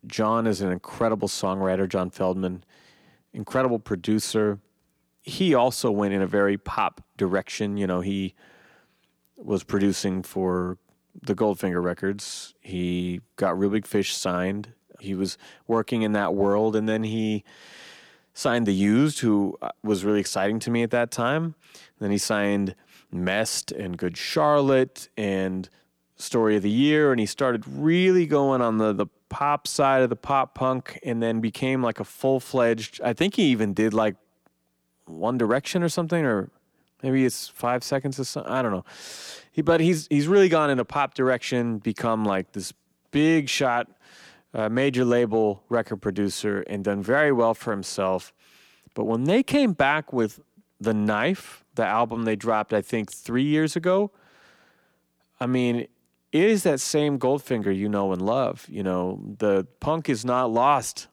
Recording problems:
none

